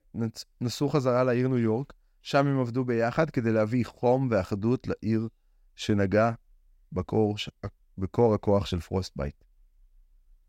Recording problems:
none

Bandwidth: 16 kHz